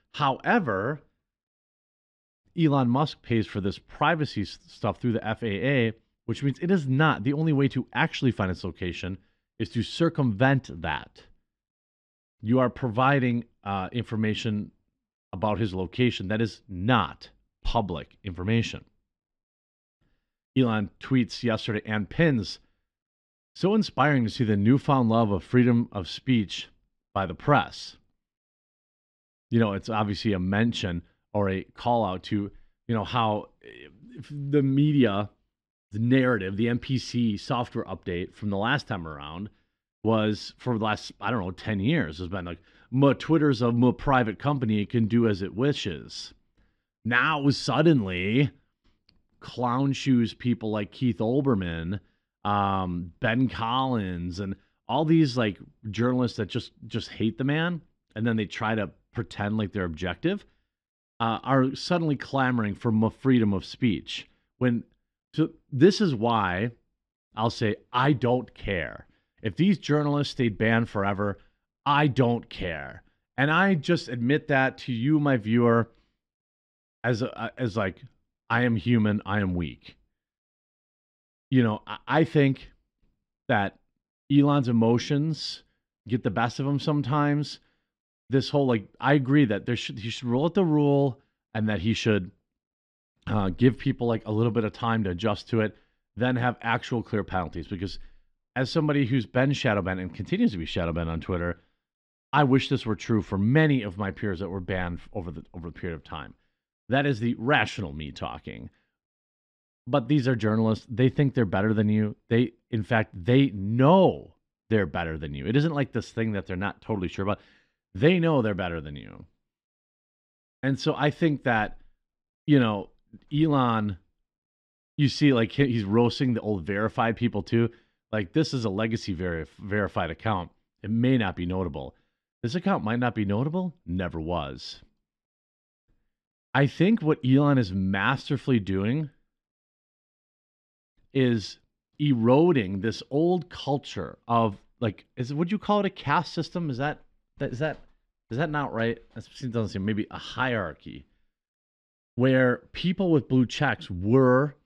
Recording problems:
muffled; slightly; fading above 3 kHz

